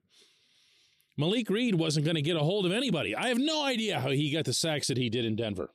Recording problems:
none

